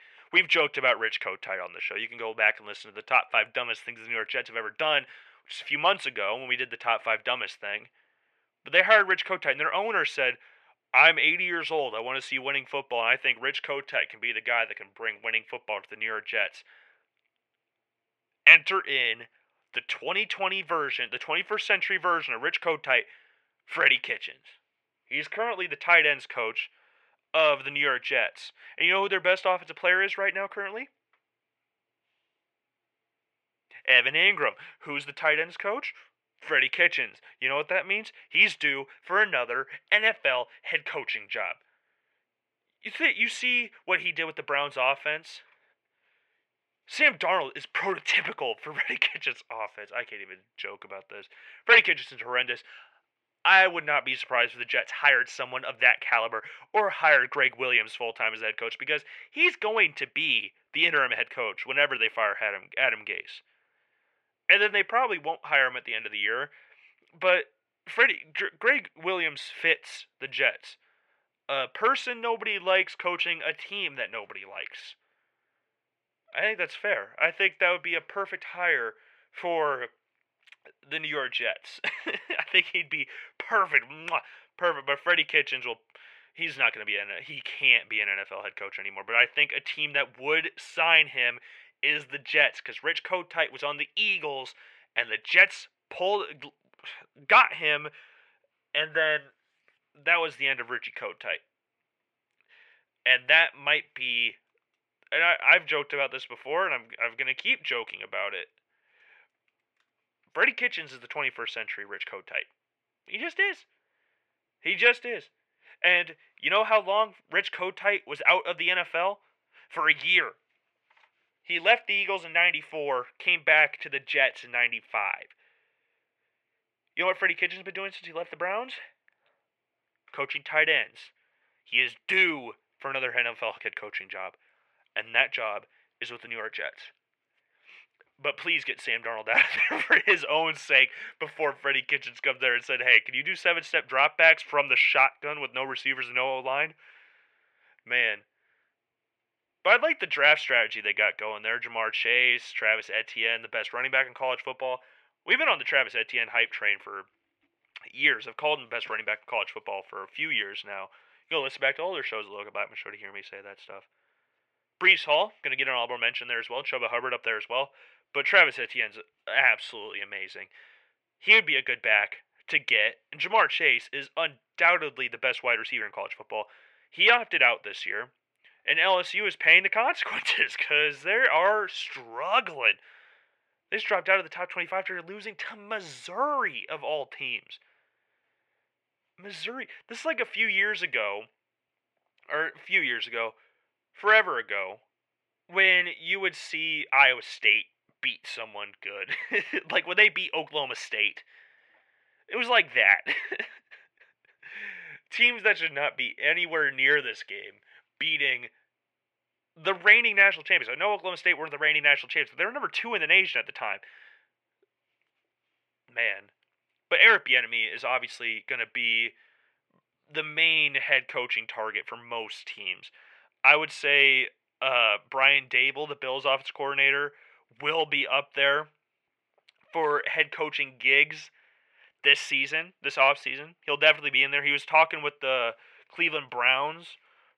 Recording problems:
thin; very; fading below 750 Hz
muffled; slightly; fading above 2.5 kHz

